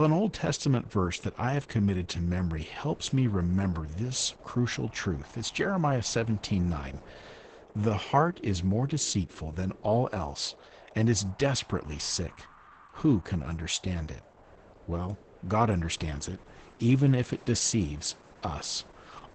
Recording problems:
garbled, watery; badly; nothing above 8 kHz
wind in the background; faint; throughout; 25 dB below the speech
abrupt cut into speech; at the start

